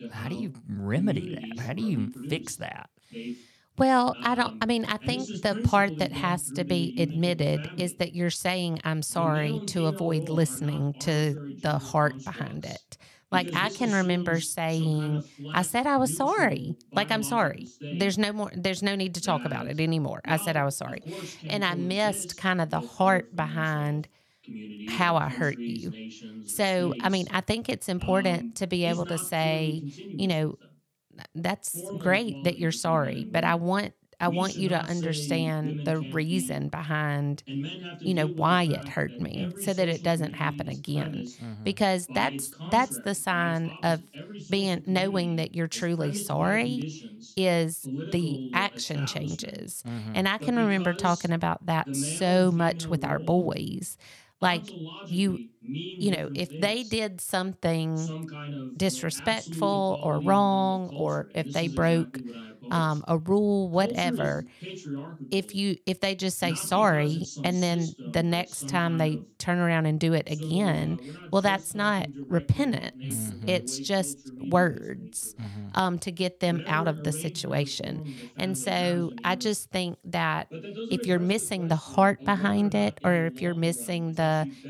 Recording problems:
voice in the background; noticeable; throughout; 10 dB below the speech

